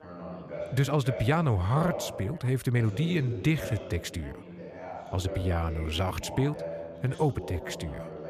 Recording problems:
background chatter; noticeable; throughout; 2 voices, 10 dB below the speech
uneven, jittery; strongly; from 0.5 to 7.5 s

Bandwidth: 14.5 kHz